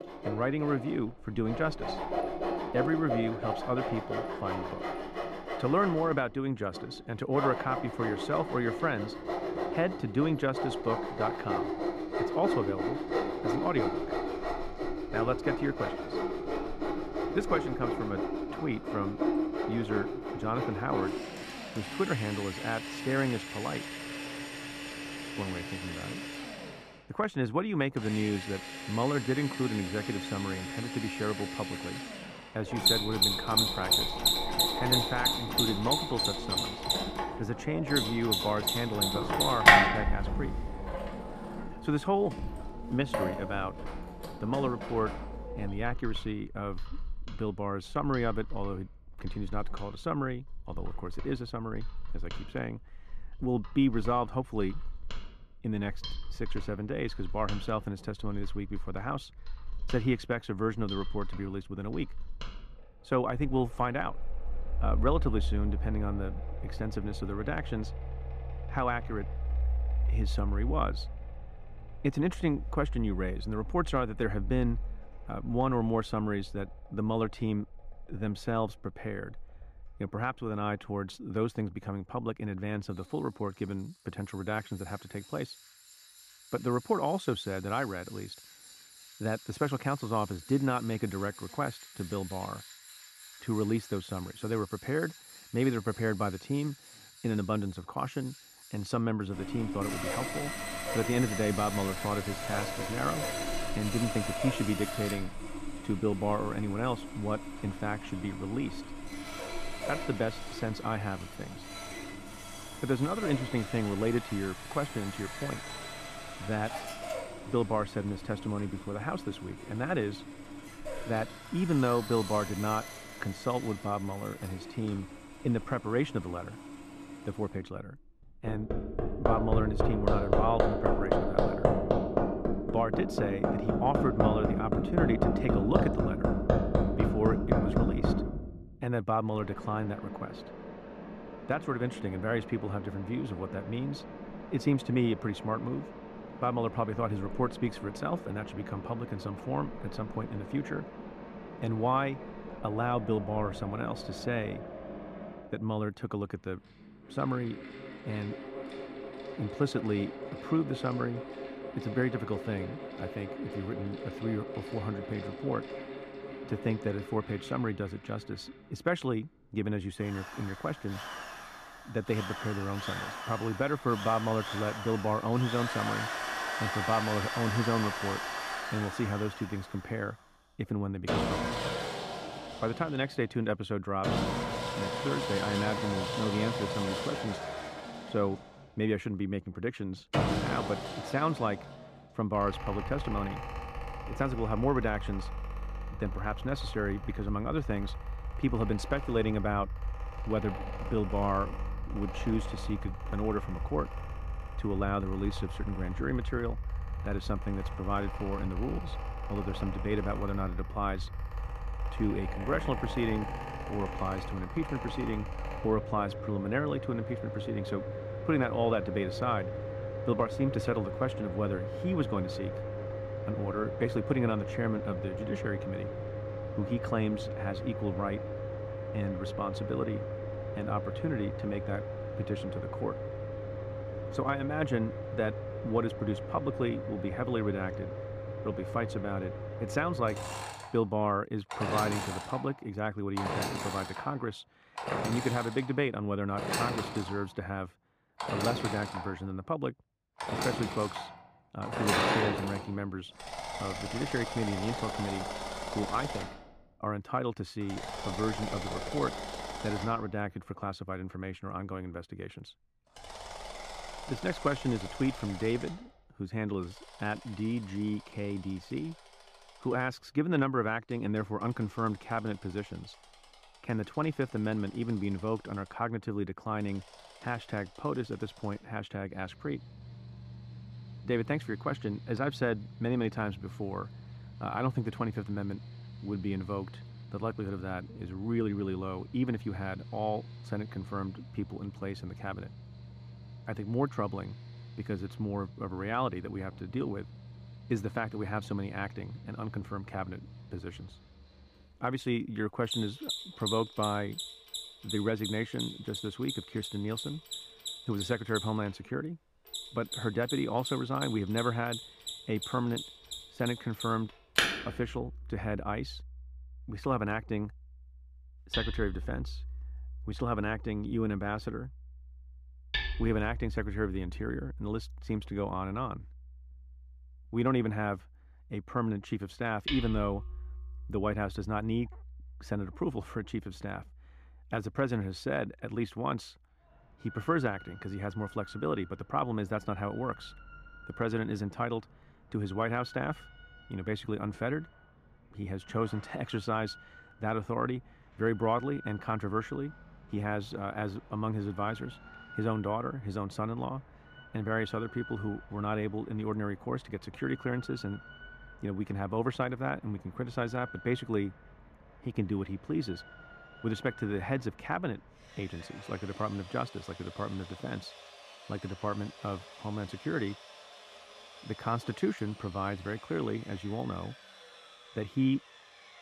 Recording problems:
muffled; slightly; fading above 2 kHz
machinery noise; loud; throughout; 2 dB below the speech

